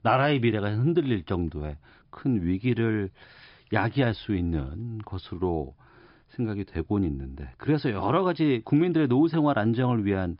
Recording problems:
high frequencies cut off; noticeable; nothing above 5.5 kHz

